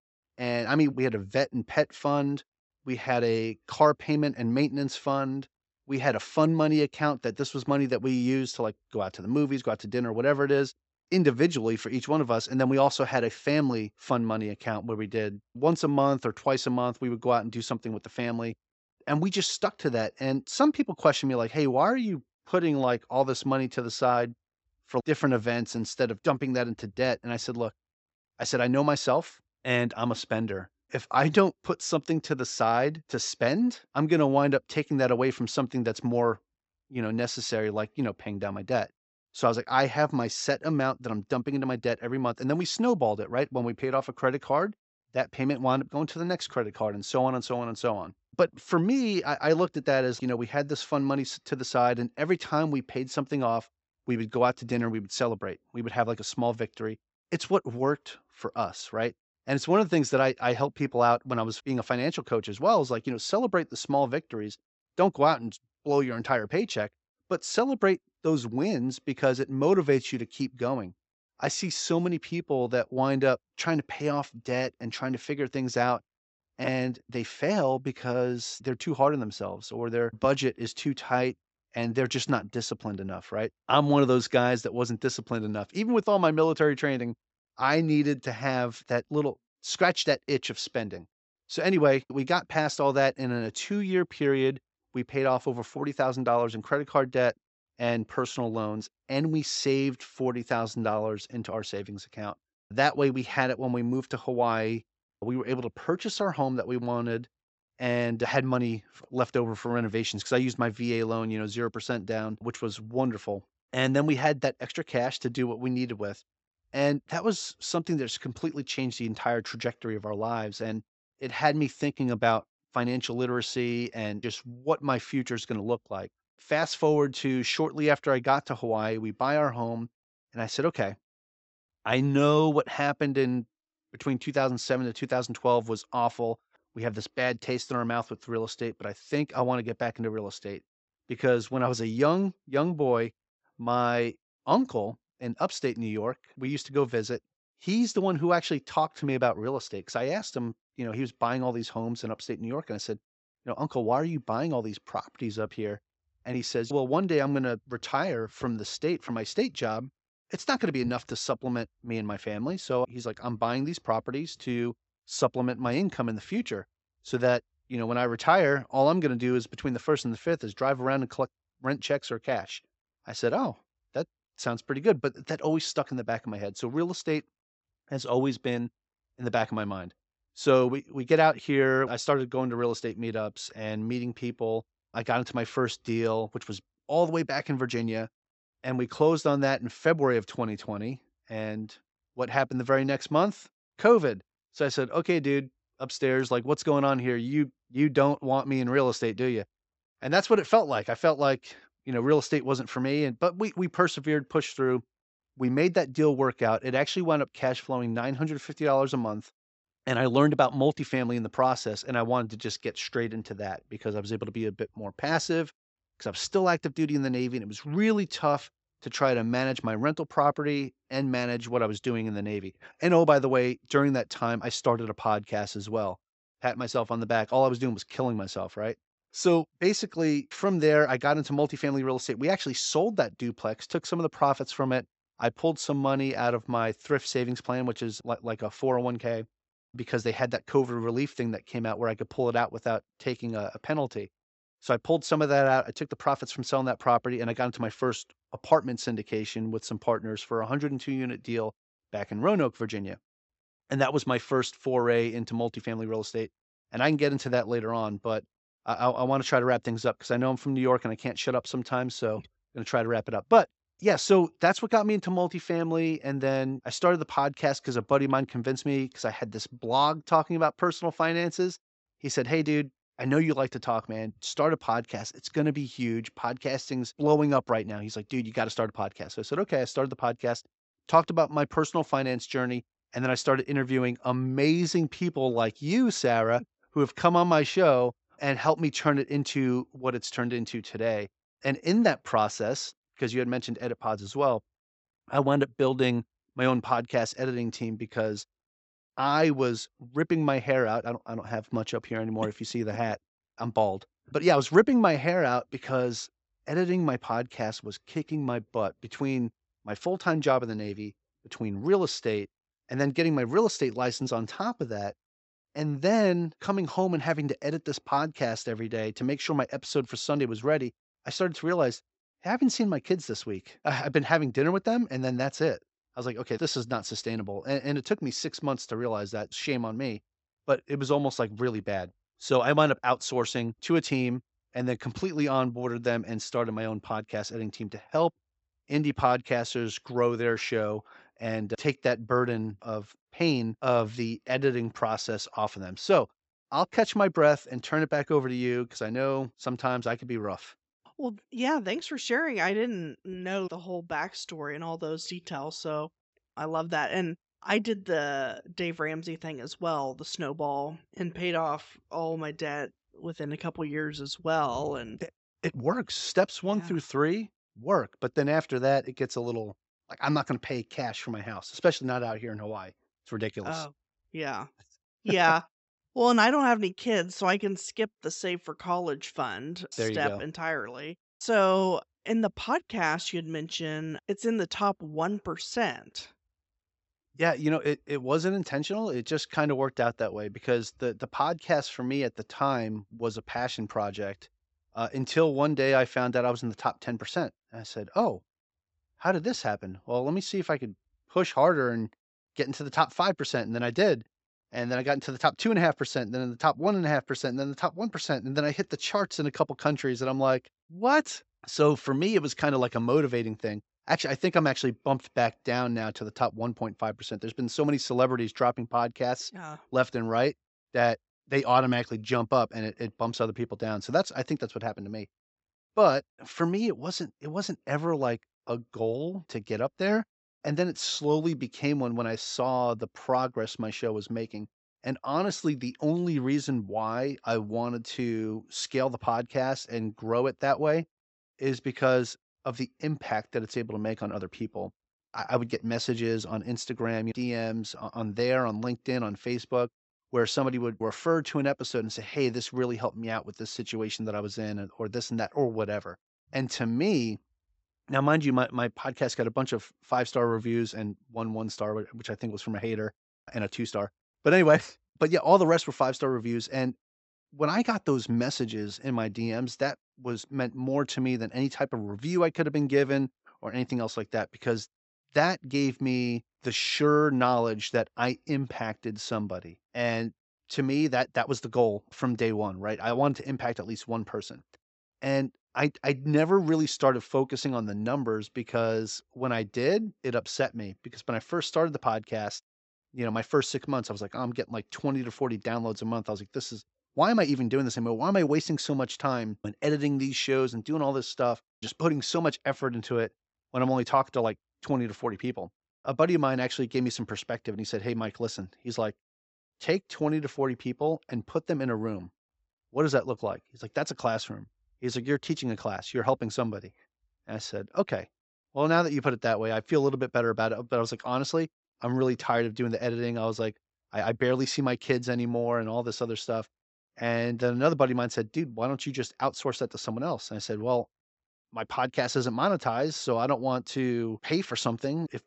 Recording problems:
high frequencies cut off; noticeable; nothing above 8 kHz

